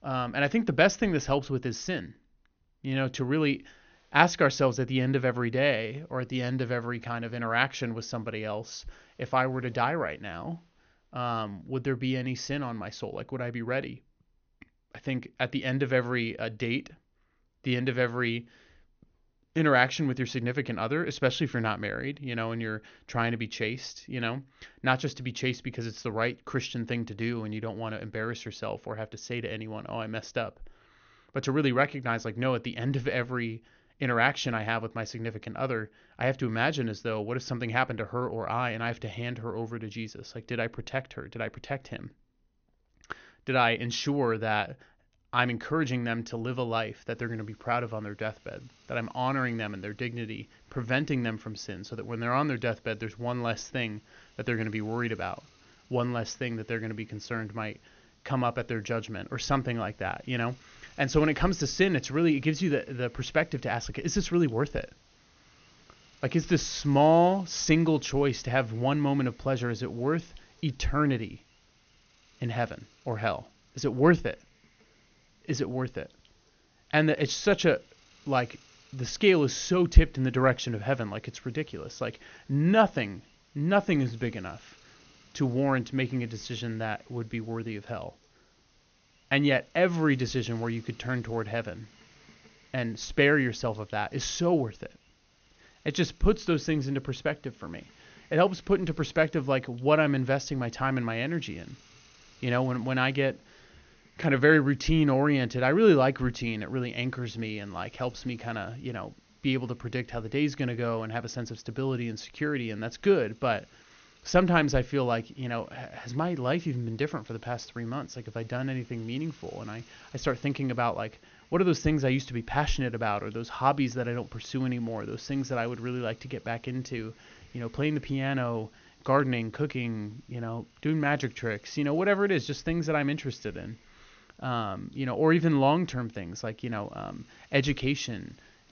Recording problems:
high frequencies cut off; noticeable; nothing above 6.5 kHz
hiss; faint; from 47 s on; 30 dB below the speech

